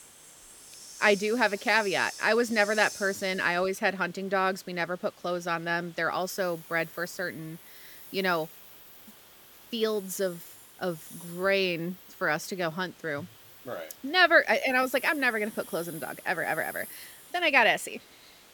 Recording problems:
hiss; noticeable; throughout; 20 dB below the speech

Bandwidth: 18.5 kHz